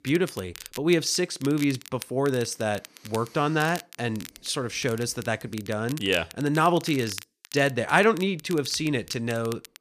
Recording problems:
crackle, like an old record; noticeable; 15 dB below the speech

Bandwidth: 14.5 kHz